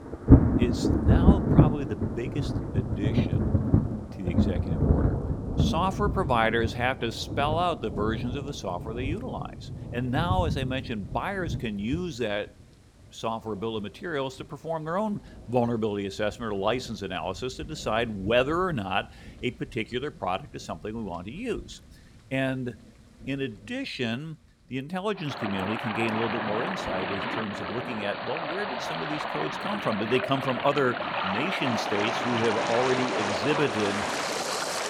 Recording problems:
rain or running water; very loud; throughout; 2 dB above the speech

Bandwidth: 17.5 kHz